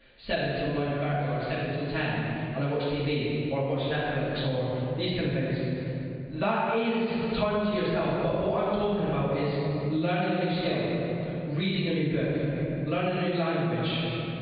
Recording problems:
room echo; strong; dies away in 2.2 s
off-mic speech; far
high frequencies cut off; severe; nothing above 4.5 kHz
squashed, flat; somewhat

